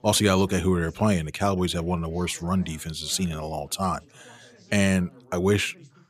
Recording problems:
background chatter; faint; throughout; 3 voices, 25 dB below the speech

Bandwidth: 14.5 kHz